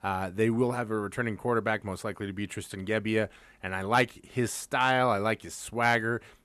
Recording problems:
none

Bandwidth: 13.5 kHz